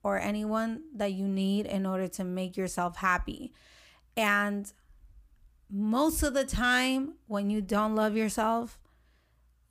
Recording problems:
none

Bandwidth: 15 kHz